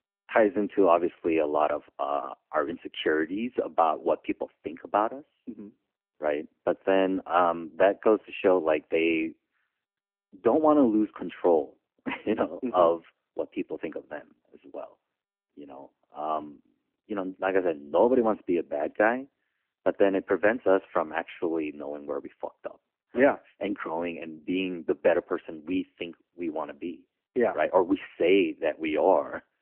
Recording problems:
phone-call audio; nothing above 3 kHz

